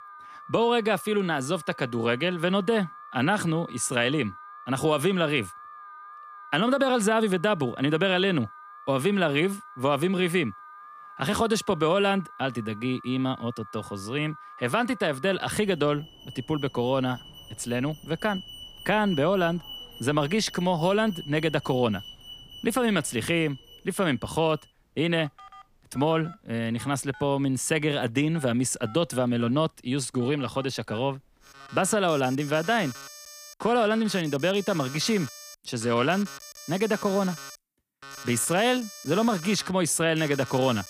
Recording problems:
alarms or sirens; noticeable; throughout; 15 dB below the speech

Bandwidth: 15 kHz